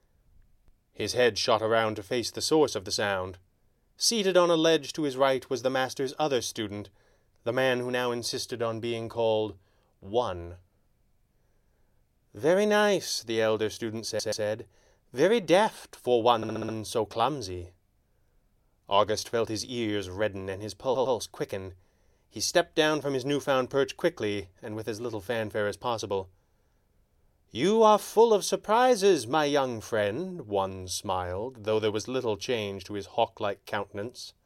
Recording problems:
audio stuttering; at 14 s, at 16 s and at 21 s

